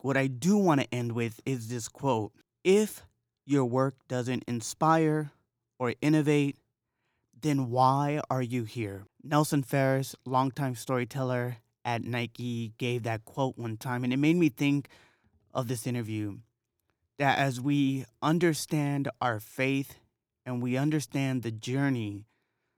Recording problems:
none

